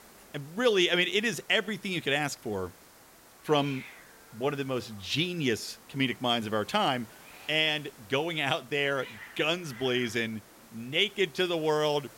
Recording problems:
hiss; faint; throughout; 20 dB below the speech

